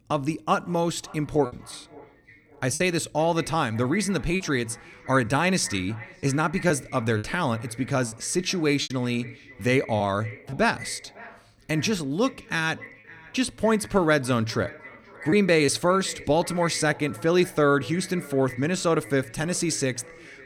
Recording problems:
echo of what is said; faint; throughout; 550 ms later, 20 dB below the speech
choppy; occasionally; 3% of the speech affected

